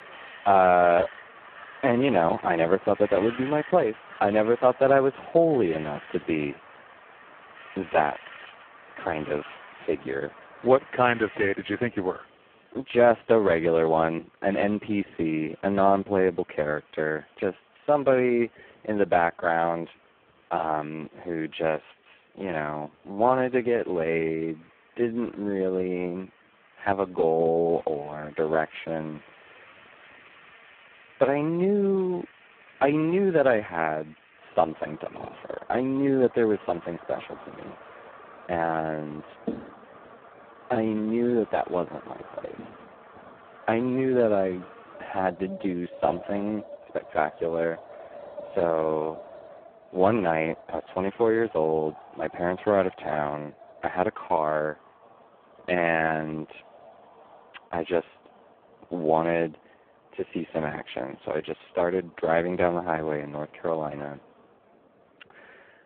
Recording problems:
phone-call audio; poor line
wind in the background; faint; throughout; 20 dB below the speech

